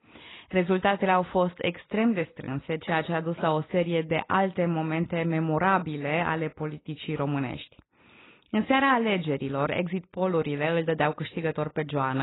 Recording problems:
garbled, watery; badly; nothing above 4 kHz
abrupt cut into speech; at the end

